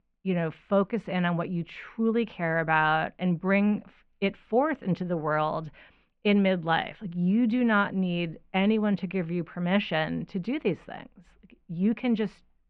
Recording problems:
muffled; very; fading above 2.5 kHz

